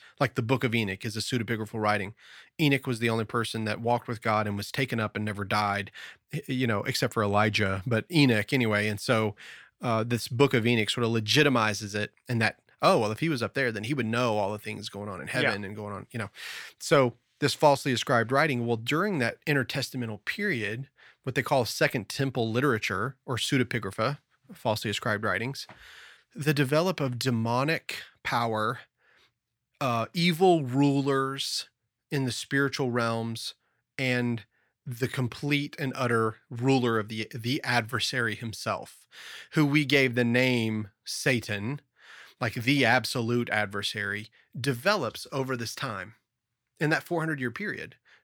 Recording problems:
none

